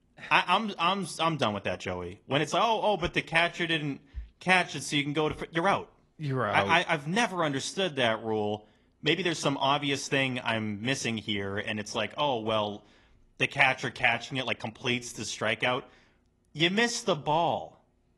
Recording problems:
garbled, watery; slightly; nothing above 11 kHz
uneven, jittery; strongly; from 1 to 18 s

